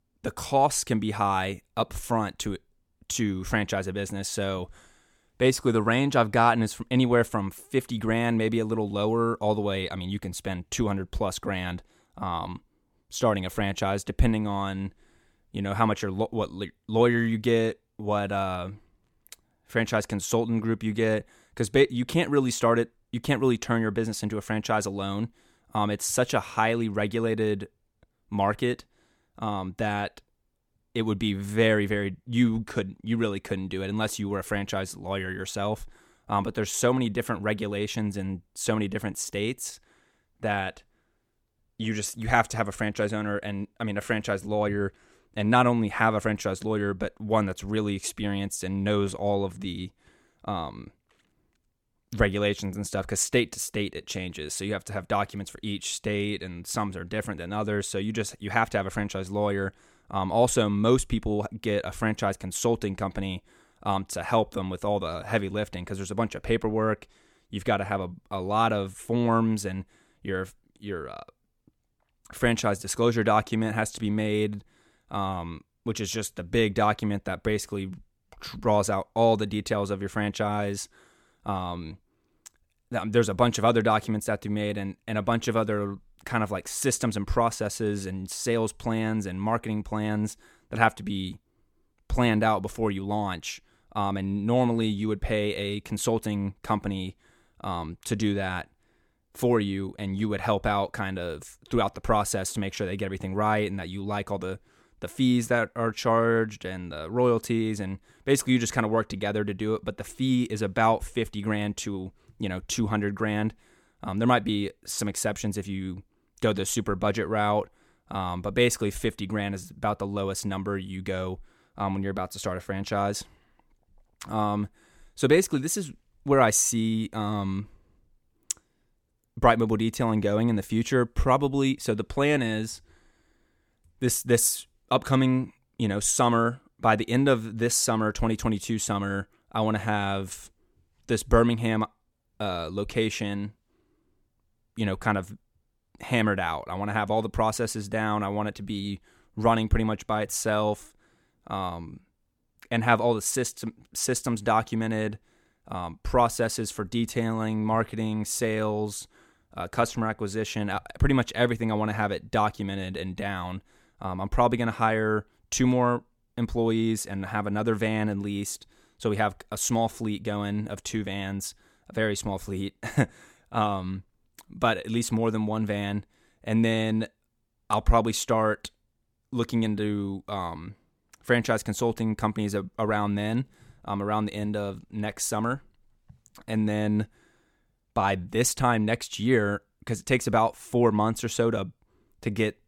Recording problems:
none

